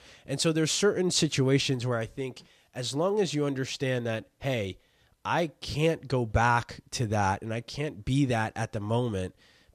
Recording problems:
none

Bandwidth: 14 kHz